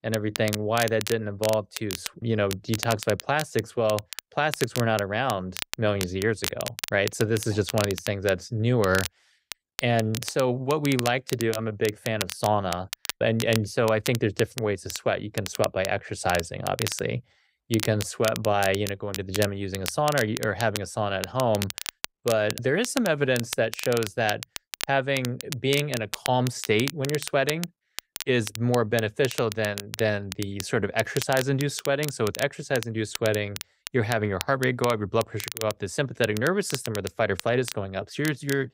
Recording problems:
crackle, like an old record; loud; 9 dB below the speech

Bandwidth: 15.5 kHz